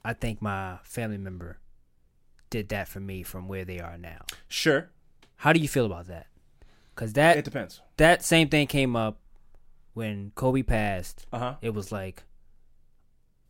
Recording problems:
none

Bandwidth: 16 kHz